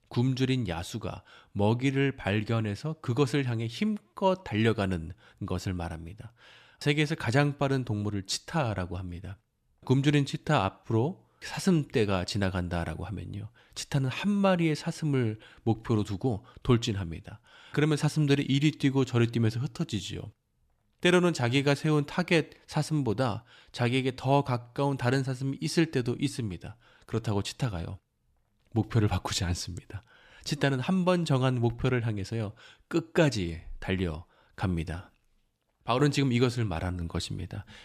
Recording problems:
none

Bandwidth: 14.5 kHz